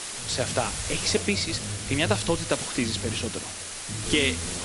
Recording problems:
garbled, watery; slightly; nothing above 11 kHz
voice in the background; loud; throughout; 9 dB below the speech
hiss; loud; throughout; 5 dB below the speech

